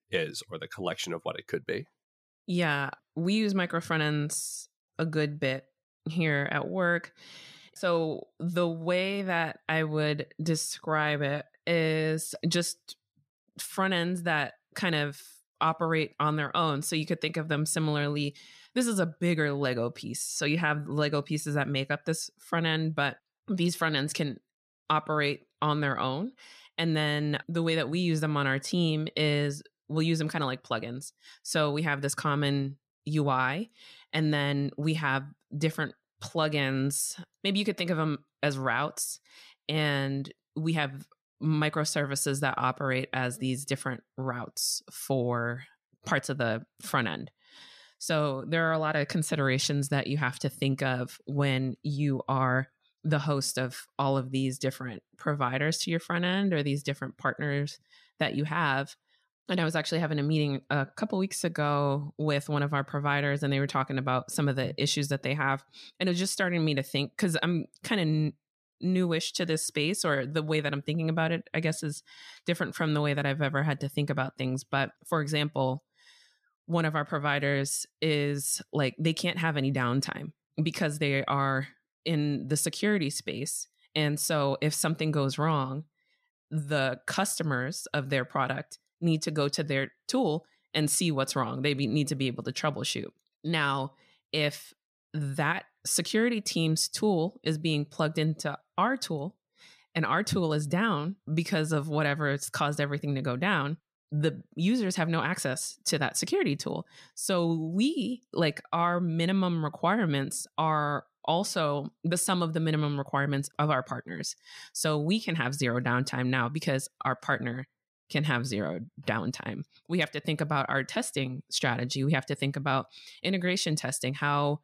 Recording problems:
none

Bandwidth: 14.5 kHz